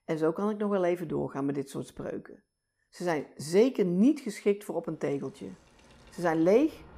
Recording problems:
train or aircraft noise; faint; from 5 s on; 30 dB below the speech

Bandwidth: 15 kHz